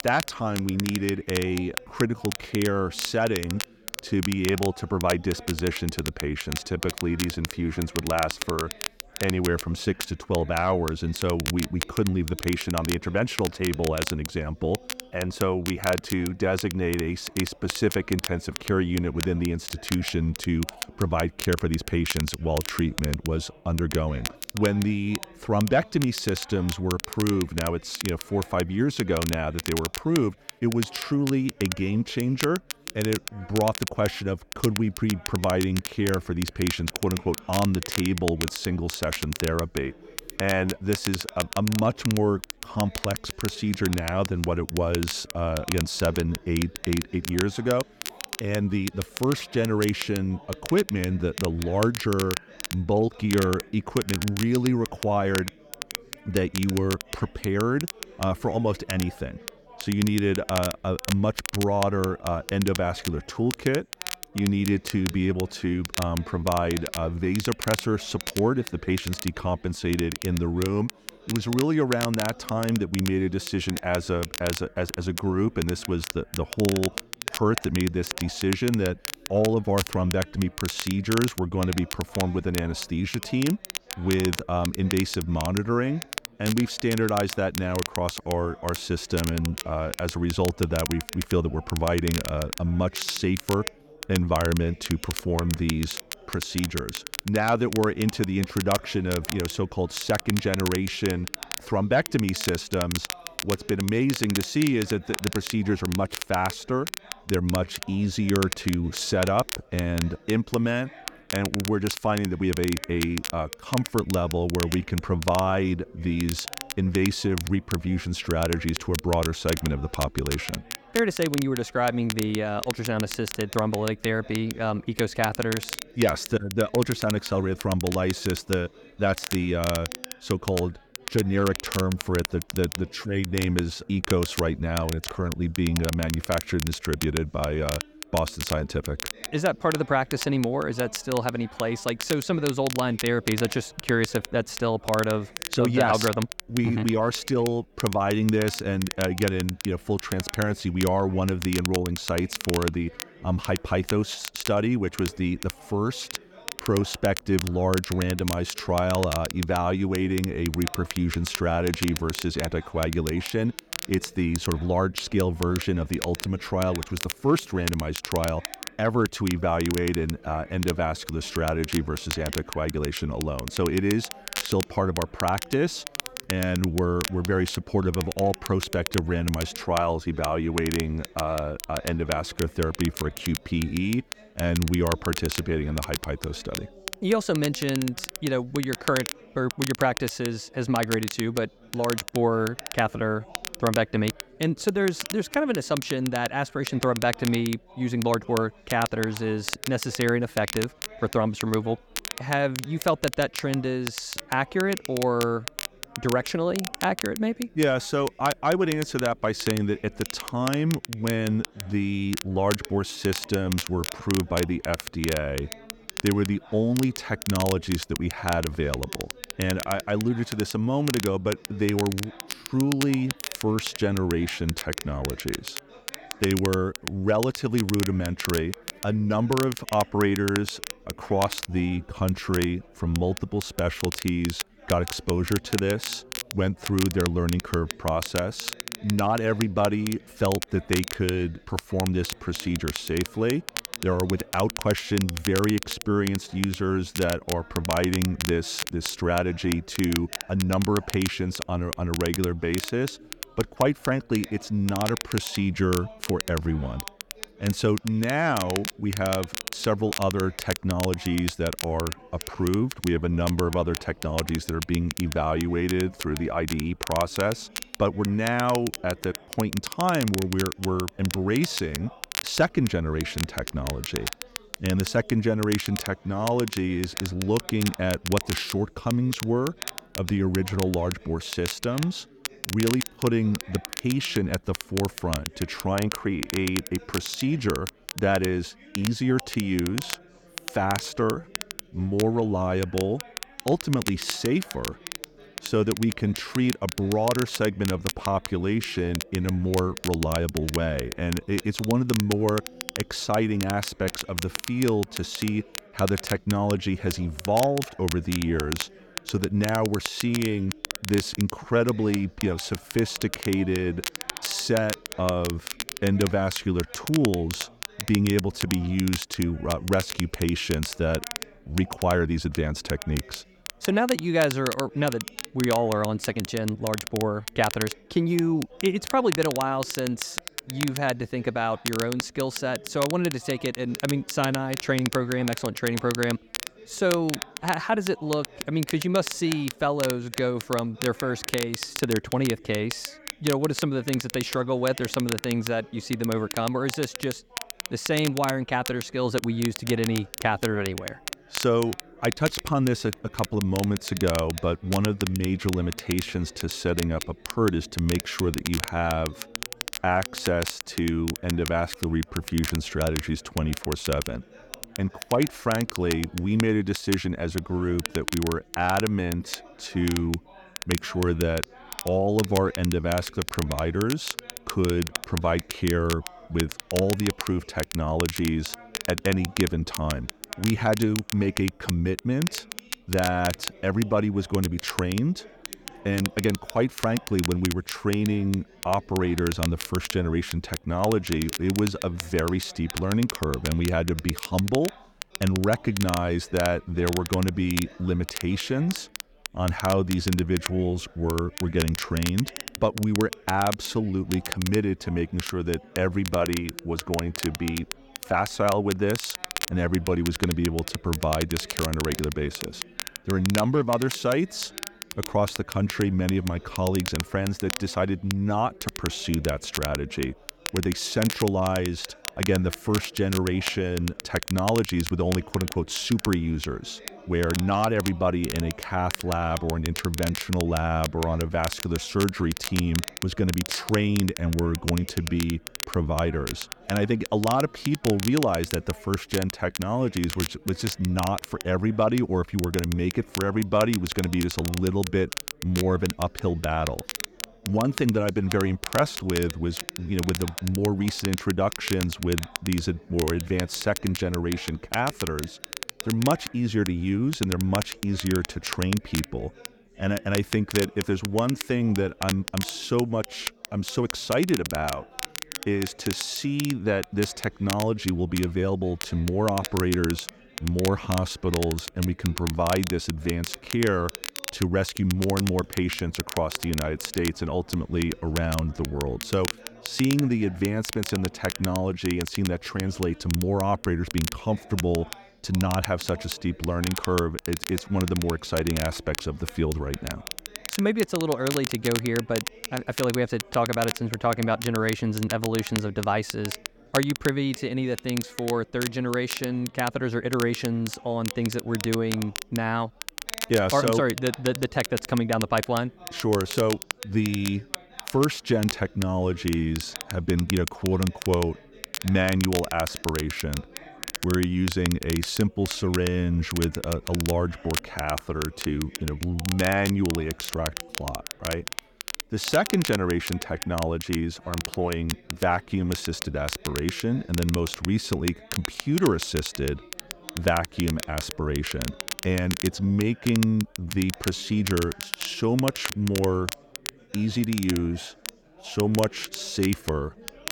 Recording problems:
crackle, like an old record; loud; 8 dB below the speech
chatter from many people; faint; throughout; 25 dB below the speech

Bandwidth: 18 kHz